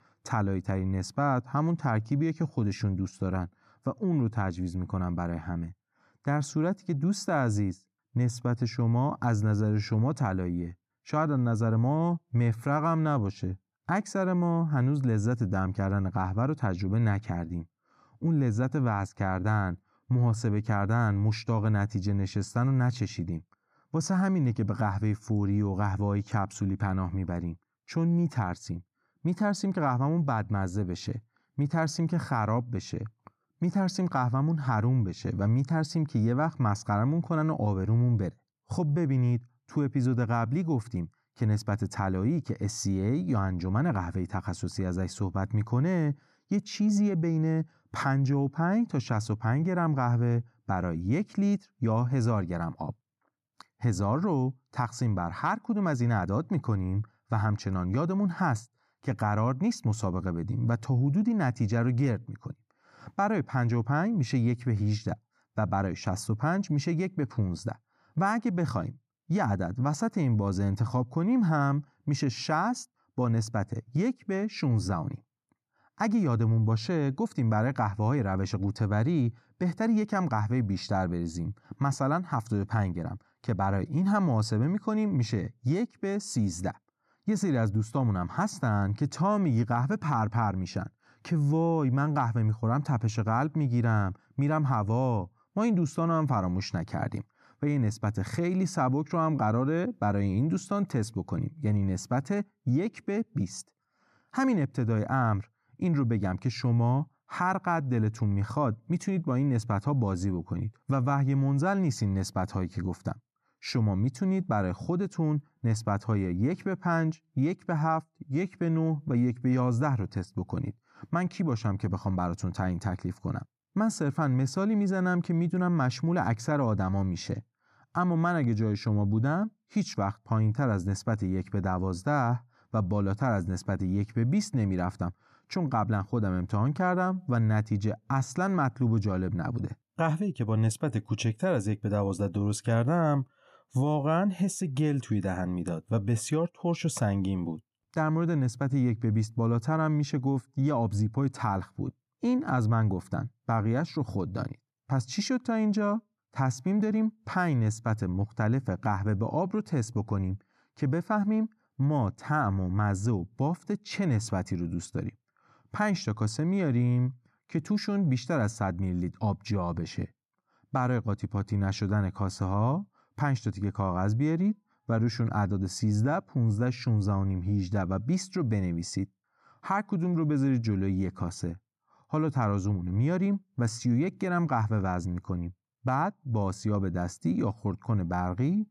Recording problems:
none

